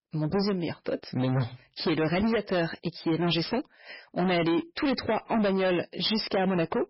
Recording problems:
distortion; heavy; 20% of the sound clipped
garbled, watery; badly; nothing above 5.5 kHz

